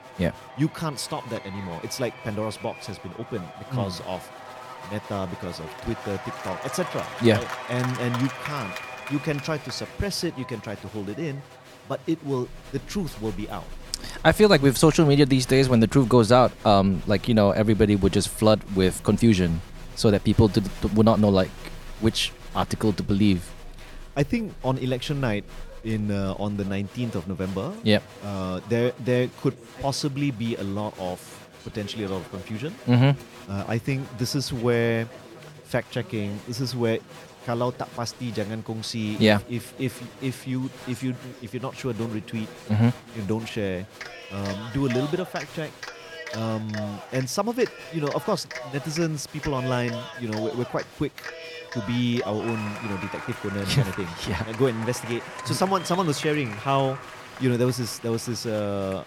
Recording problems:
crowd noise; noticeable; throughout; 15 dB below the speech

